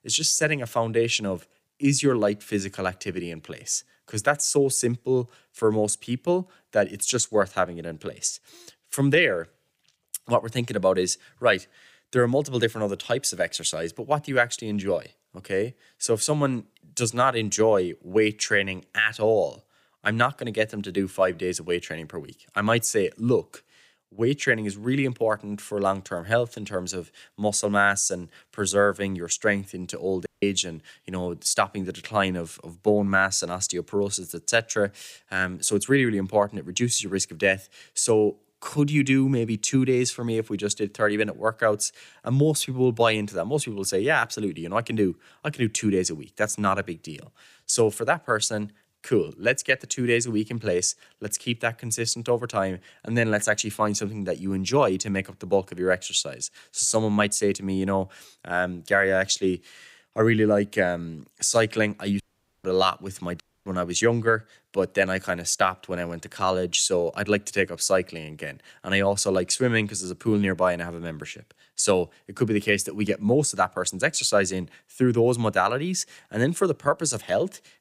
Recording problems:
audio cutting out; at 30 s, at 1:02 and at 1:03

